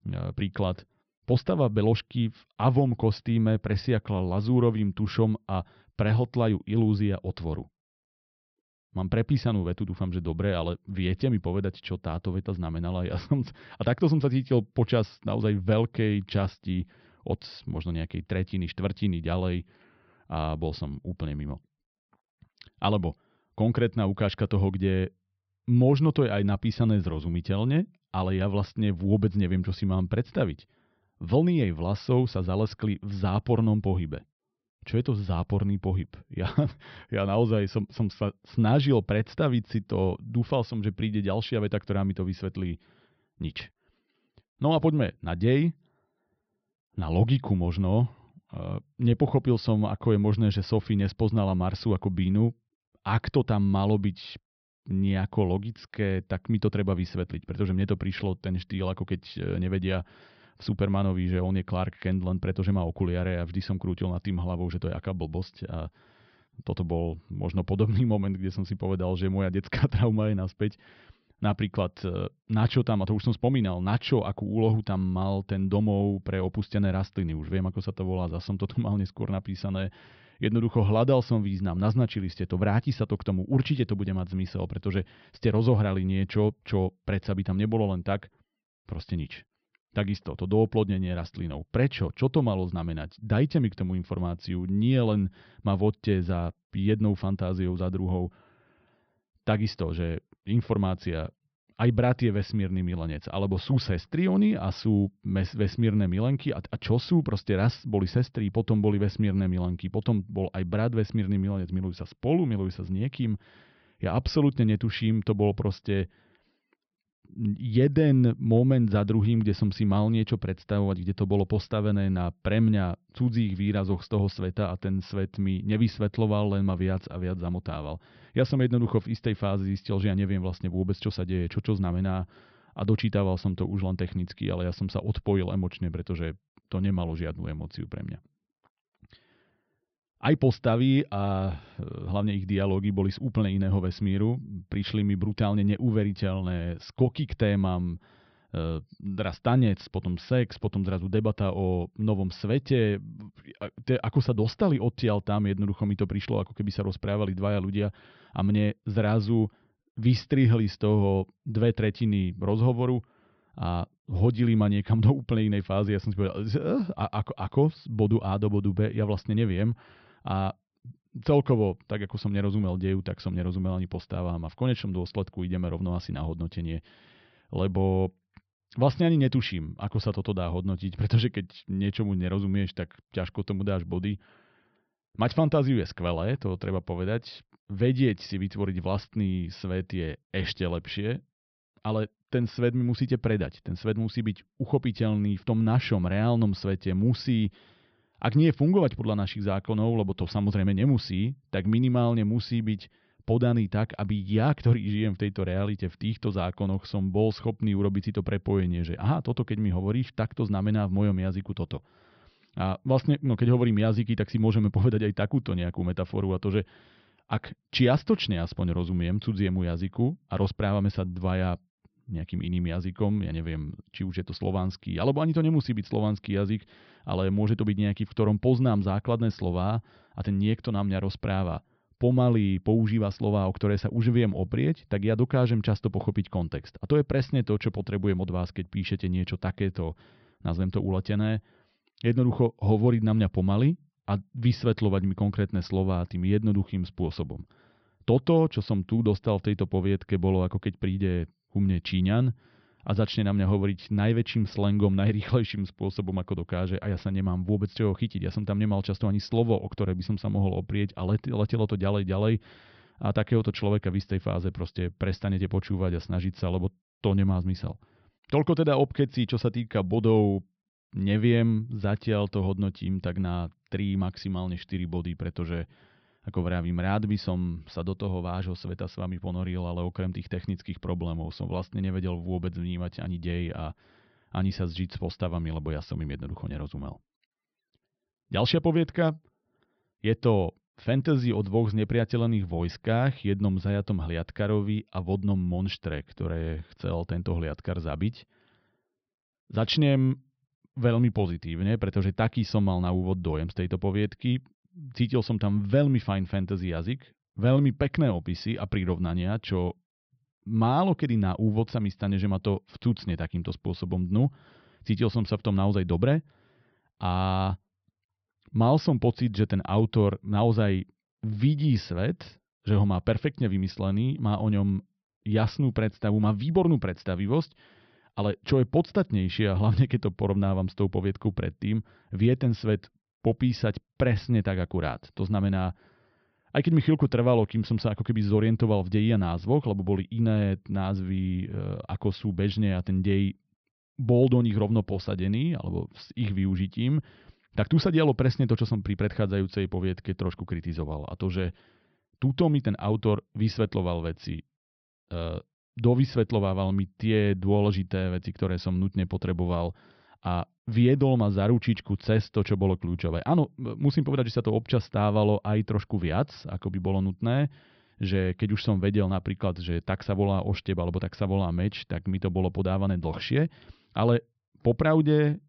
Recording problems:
high frequencies cut off; noticeable; nothing above 5.5 kHz

